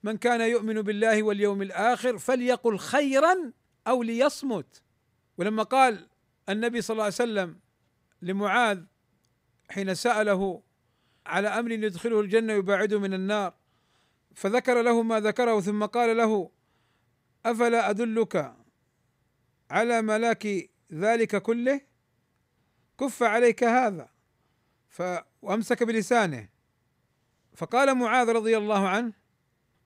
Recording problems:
none

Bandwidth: 15.5 kHz